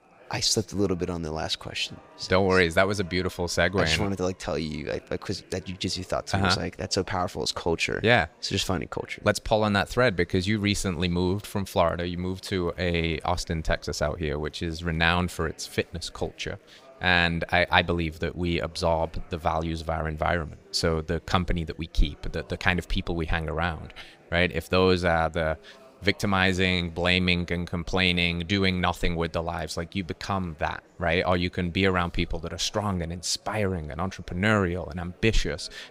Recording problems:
murmuring crowd; faint; throughout; 30 dB below the speech

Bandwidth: 15.5 kHz